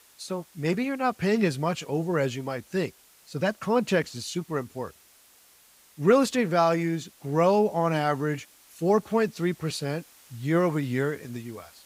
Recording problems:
hiss; faint; throughout; 25 dB below the speech

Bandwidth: 15.5 kHz